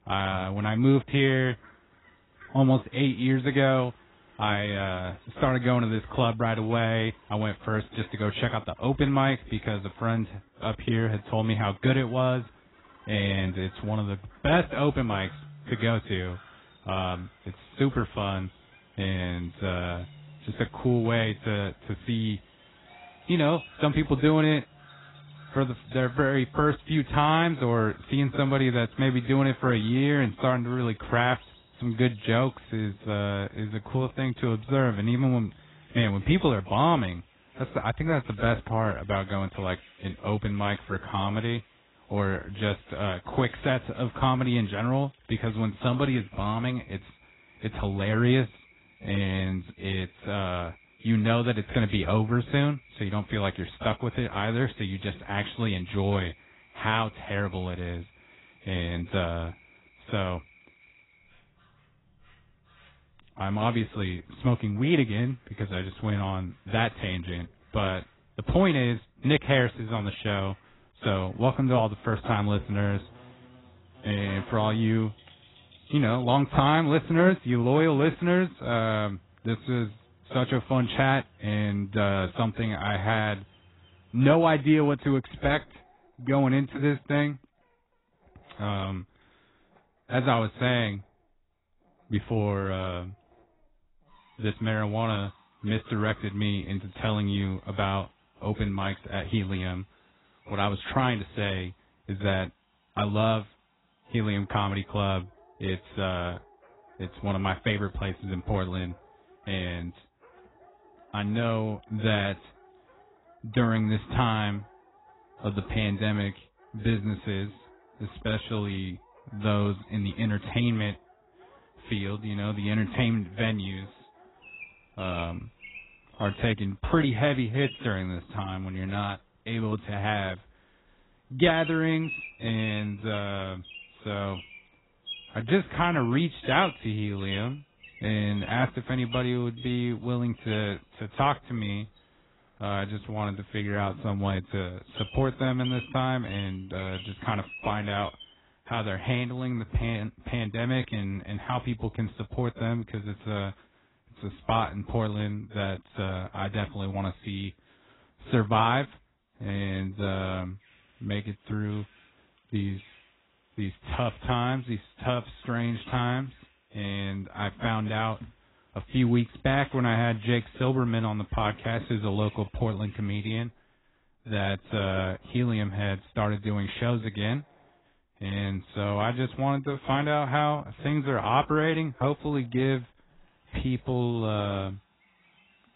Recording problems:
garbled, watery; badly; nothing above 4 kHz
animal sounds; faint; throughout; 20 dB below the speech

